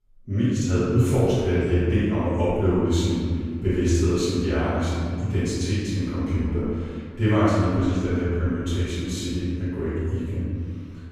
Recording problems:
room echo; strong; dies away in 1.9 s
off-mic speech; far

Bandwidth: 15.5 kHz